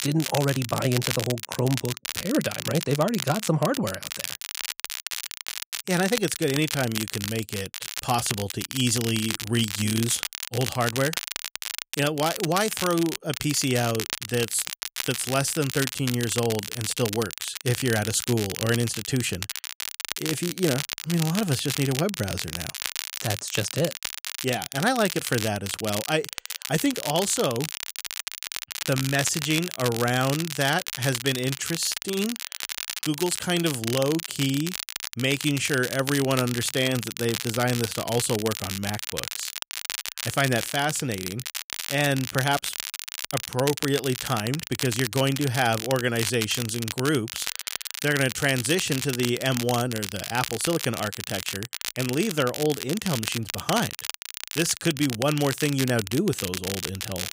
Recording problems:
crackle, like an old record; loud; 5 dB below the speech

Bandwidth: 15.5 kHz